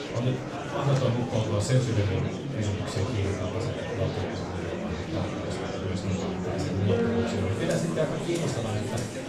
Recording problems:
off-mic speech; far
room echo; slight; dies away in 0.4 s
background music; loud; throughout; 6 dB below the speech
murmuring crowd; loud; throughout; 3 dB below the speech

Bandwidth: 14.5 kHz